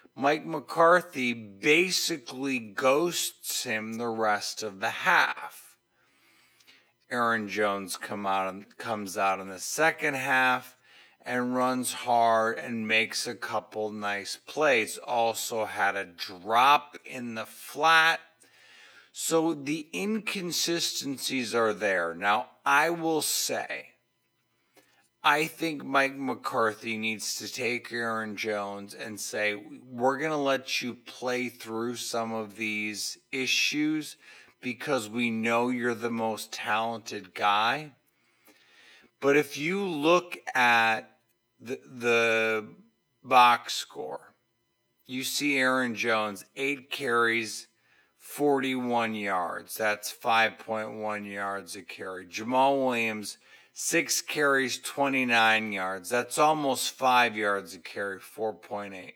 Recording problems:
wrong speed, natural pitch; too slow; 0.6 times normal speed
thin; very slightly; fading below 300 Hz

